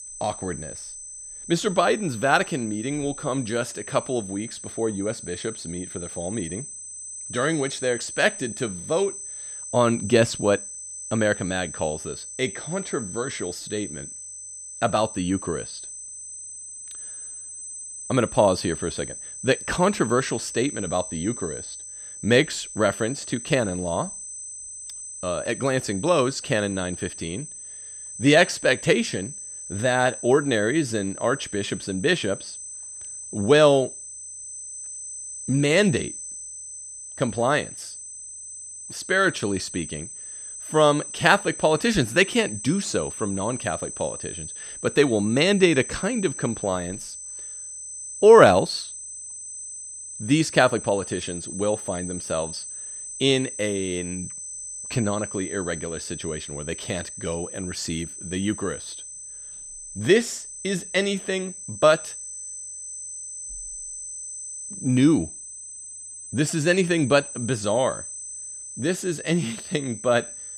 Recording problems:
high-pitched whine; noticeable; throughout; 8 kHz, 10 dB below the speech

